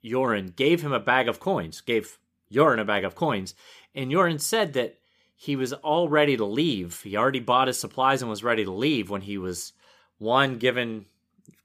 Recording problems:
none

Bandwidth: 15 kHz